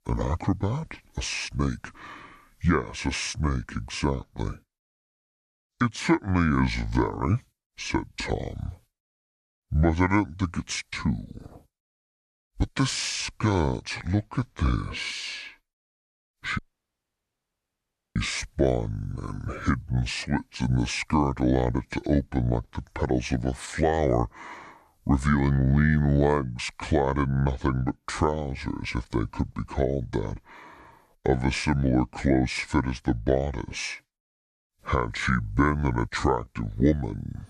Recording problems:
wrong speed and pitch; too slow and too low; 0.7 times normal speed
audio cutting out; at 17 s for 1.5 s

